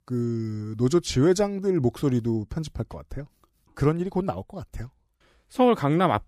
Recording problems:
none

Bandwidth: 15 kHz